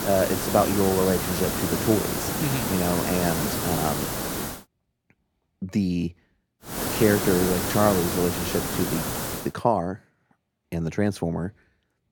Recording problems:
hiss; loud; until 4.5 s and from 6.5 to 9.5 s; 1 dB below the speech

